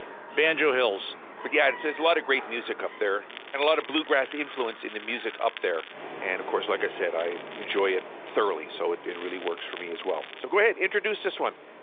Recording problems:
phone-call audio; nothing above 3.5 kHz
animal sounds; noticeable; throughout; 15 dB below the speech
crackling; noticeable; from 3.5 to 6 s, at 7 s and from 9 to 10 s; 15 dB below the speech

